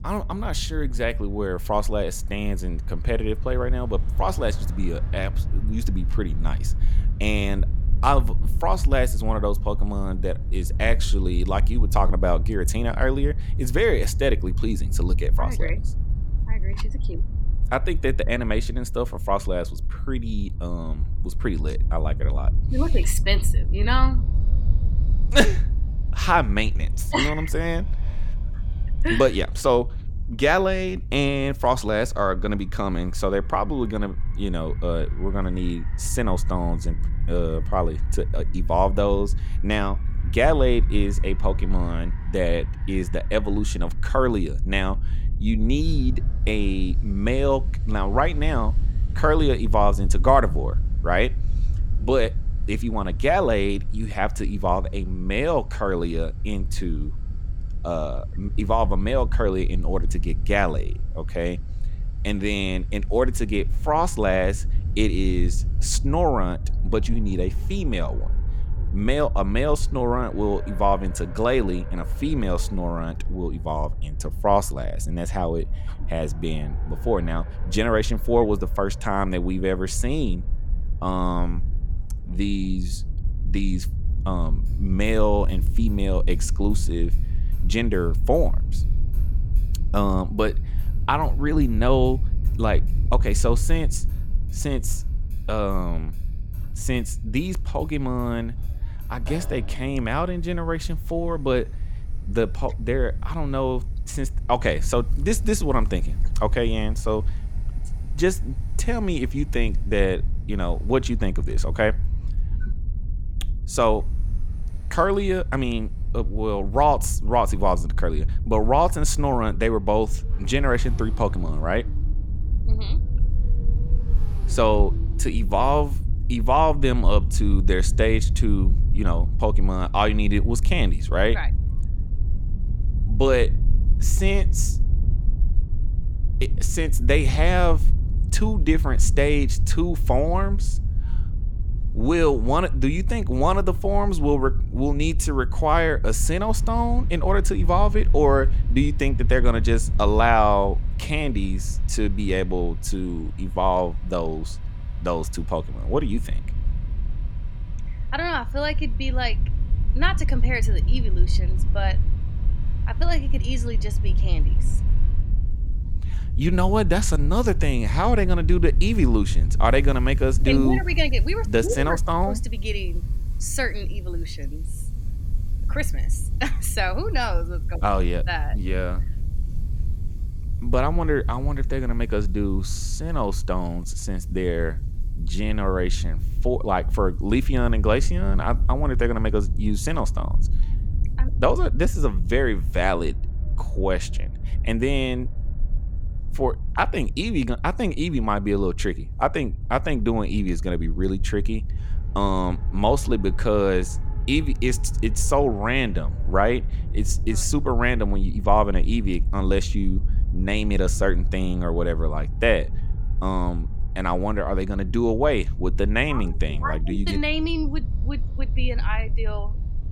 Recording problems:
traffic noise; faint; throughout; 30 dB below the speech
low rumble; faint; throughout; 20 dB below the speech

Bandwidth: 17.5 kHz